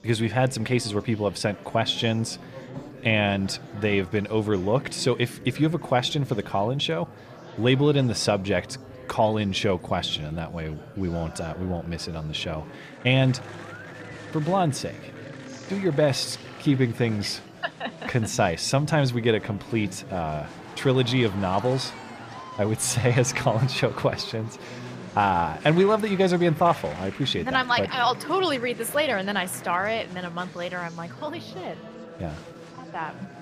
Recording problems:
murmuring crowd; noticeable; throughout; 15 dB below the speech

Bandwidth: 15 kHz